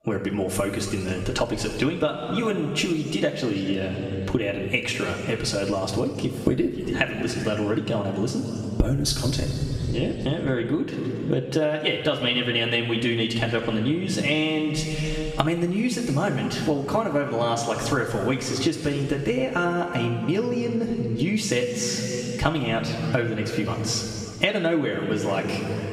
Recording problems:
room echo; noticeable; dies away in 1.9 s
off-mic speech; somewhat distant
squashed, flat; somewhat

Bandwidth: 15.5 kHz